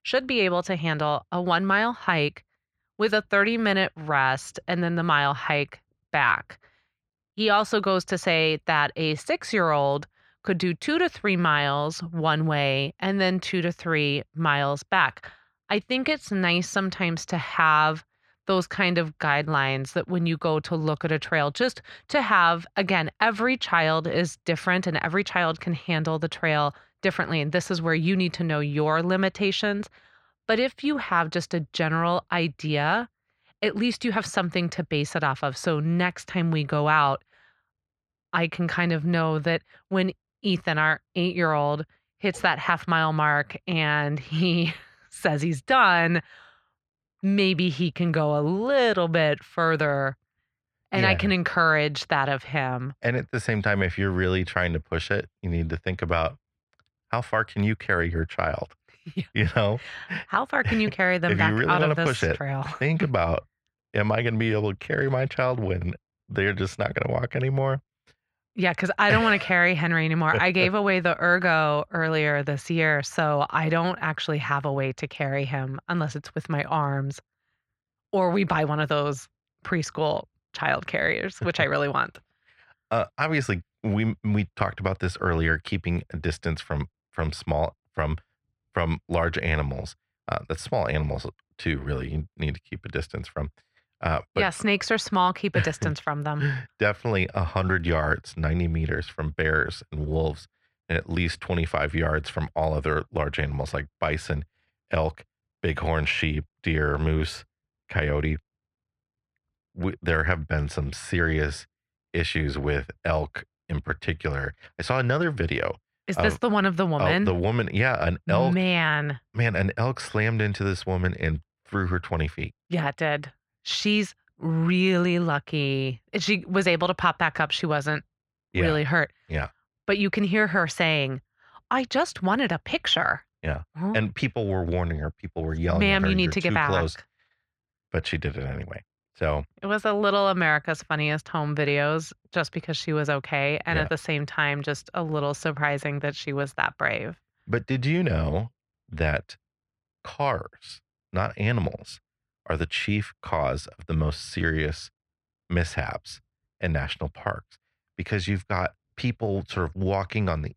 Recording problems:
muffled; slightly; fading above 3 kHz

